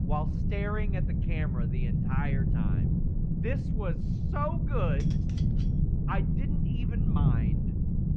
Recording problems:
muffled; slightly; fading above 2 kHz
wind noise on the microphone; heavy; 2 dB below the speech
clattering dishes; faint; at 5 s; peak 15 dB below the speech

